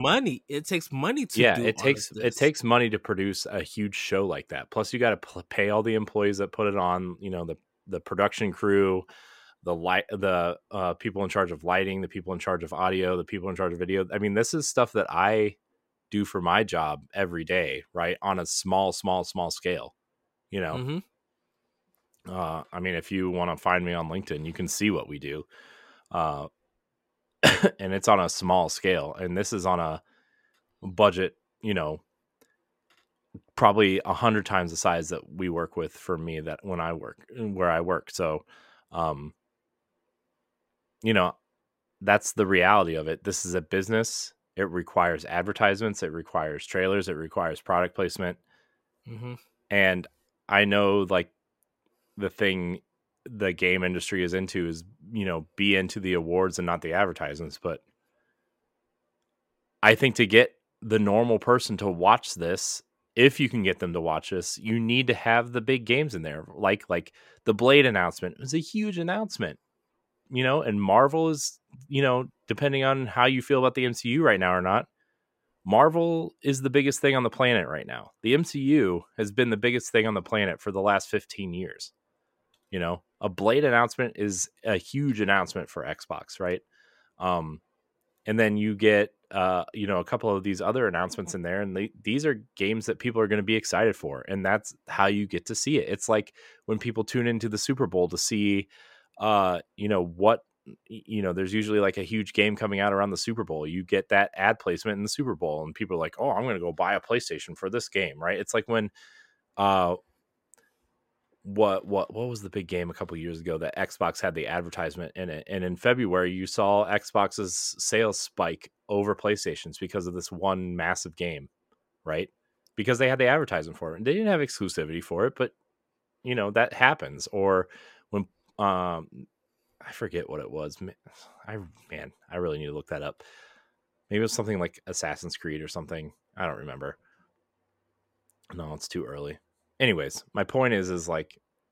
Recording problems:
abrupt cut into speech; at the start

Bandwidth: 16 kHz